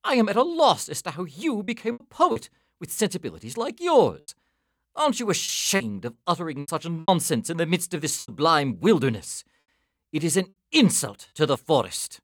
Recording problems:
choppy; very; 6% of the speech affected

